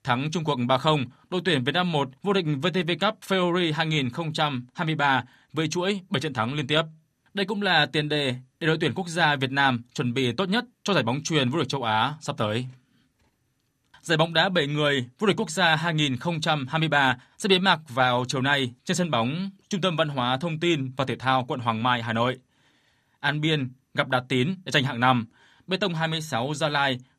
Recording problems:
none

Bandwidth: 14.5 kHz